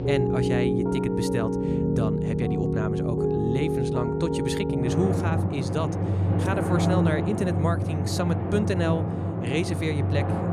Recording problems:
background music; very loud; throughout; 4 dB above the speech

